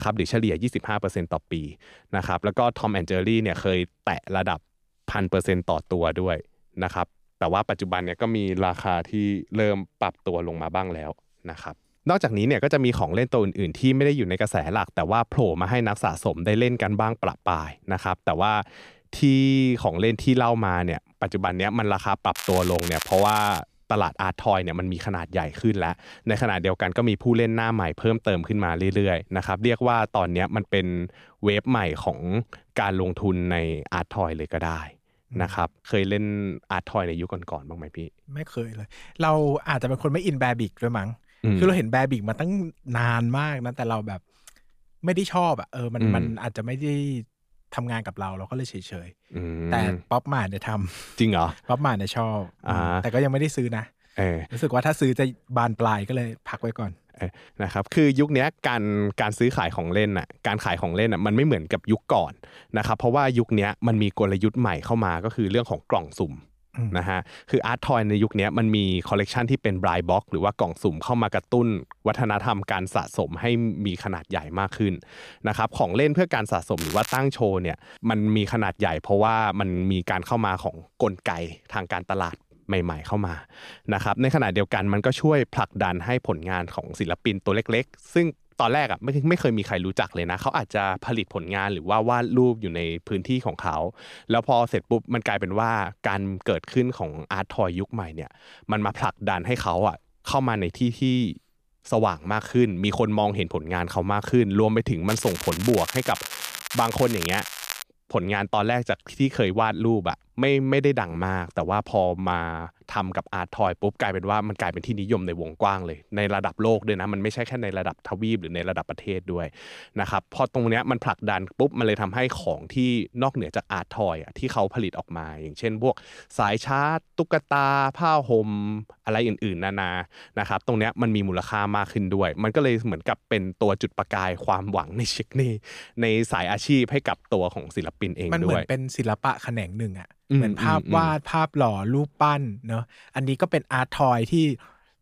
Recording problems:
crackling; loud; from 22 to 24 s, at 1:17 and from 1:45 to 1:48; 8 dB below the speech
abrupt cut into speech; at the start

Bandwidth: 14.5 kHz